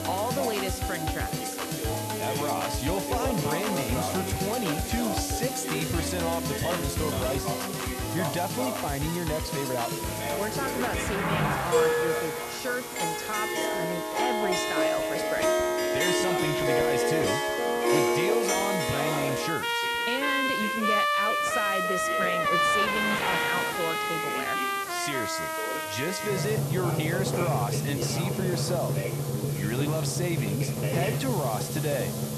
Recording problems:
background music; very loud; throughout; 4 dB above the speech
traffic noise; loud; from 8.5 s on; 4 dB below the speech
voice in the background; loud; throughout; 6 dB below the speech
hiss; loud; throughout; 6 dB below the speech
household noises; noticeable; throughout; 15 dB below the speech
alarm; faint; at 17 s; peak 15 dB below the speech
alarm; noticeable; from 22 to 26 s; peak 9 dB below the speech

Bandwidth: 13.5 kHz